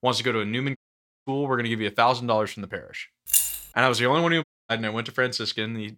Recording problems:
audio cutting out; at 1 s for 0.5 s and at 4.5 s
jangling keys; loud; at 3.5 s; peak 4 dB above the speech

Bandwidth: 16.5 kHz